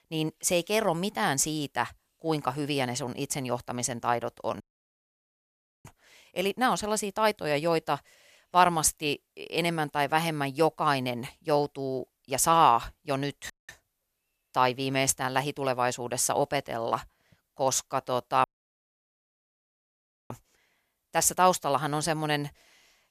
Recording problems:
audio cutting out; at 4.5 s for 1.5 s, at 14 s and at 18 s for 2 s

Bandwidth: 14.5 kHz